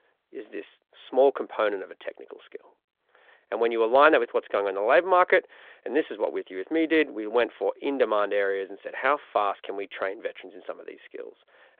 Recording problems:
phone-call audio

